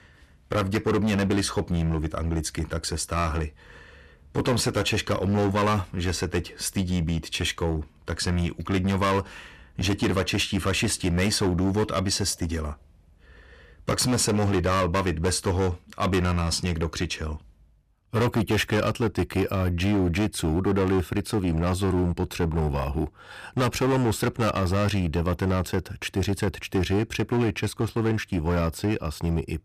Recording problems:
distortion; heavy; 13% of the sound clipped

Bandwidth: 14.5 kHz